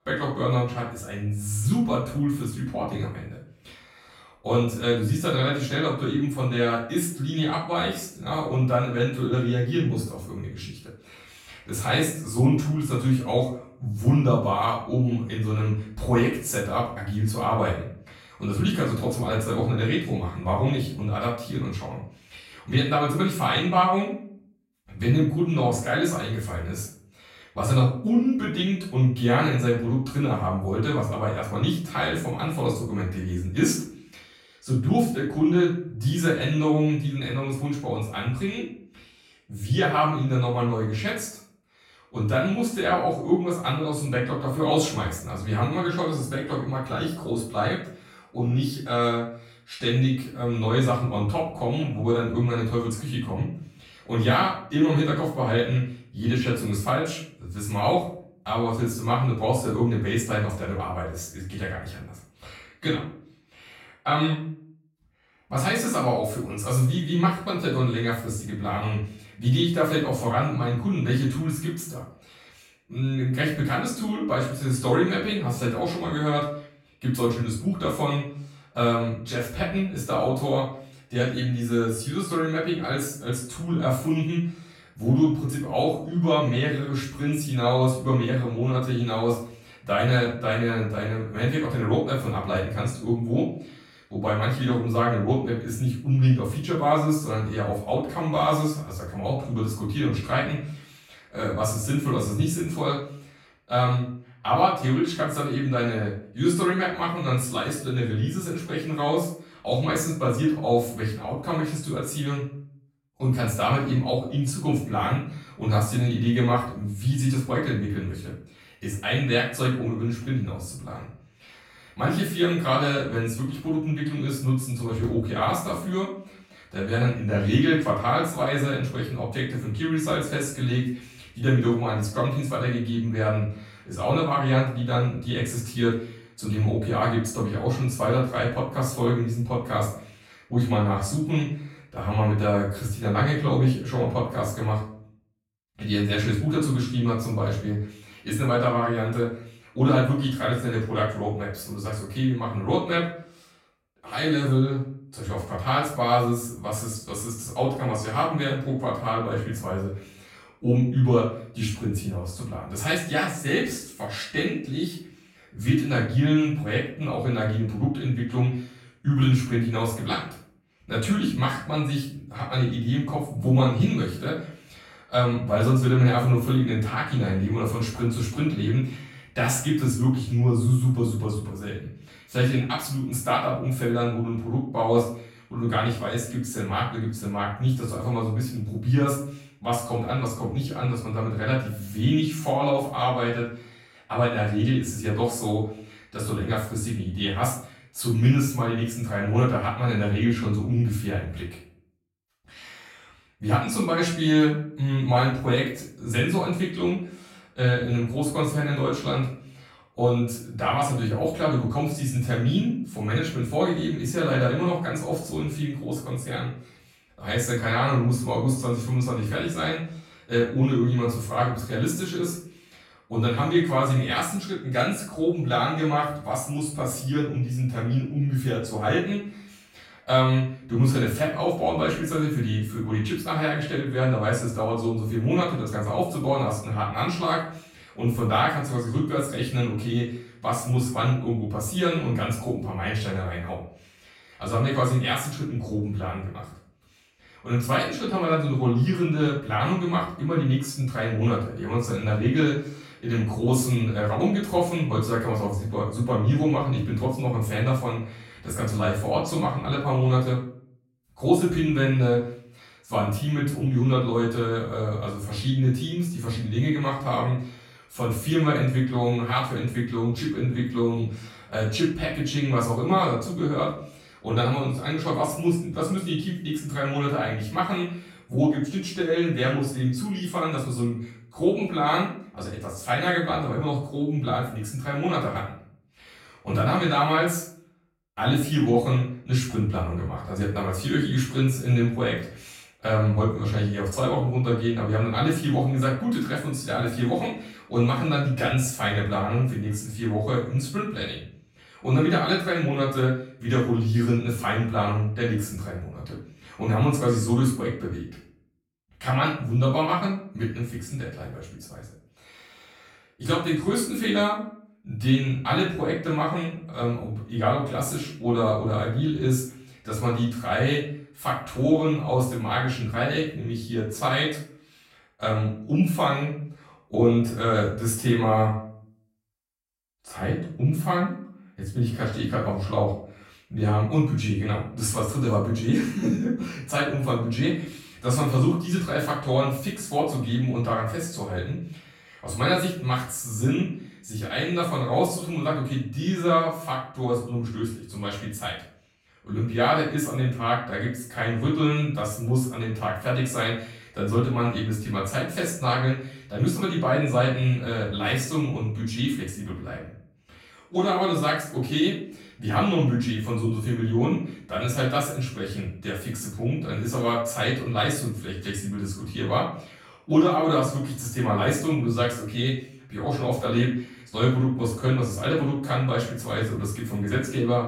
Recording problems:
off-mic speech; far
room echo; noticeable; dies away in 0.5 s

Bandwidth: 16.5 kHz